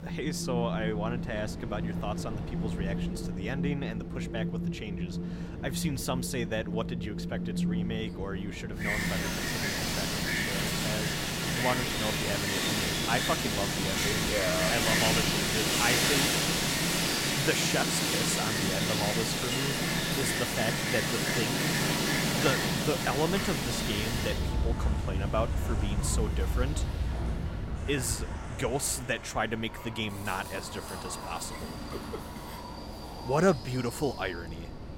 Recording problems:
wind in the background; very loud; throughout; 4 dB above the speech

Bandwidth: 16 kHz